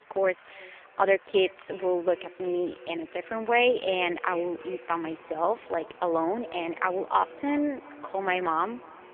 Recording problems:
phone-call audio; poor line; nothing above 3 kHz
echo of what is said; faint; throughout; 350 ms later, 20 dB below the speech
traffic noise; faint; throughout; 25 dB below the speech

